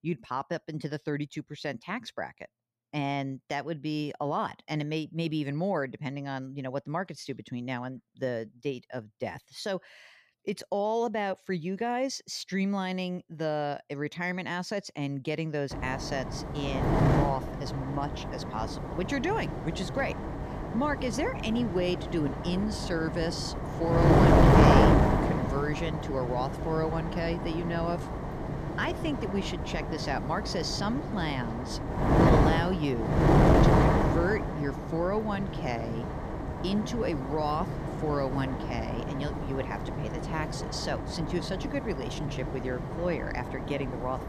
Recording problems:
wind noise on the microphone; heavy; from 16 s on; 2 dB above the speech

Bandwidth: 14.5 kHz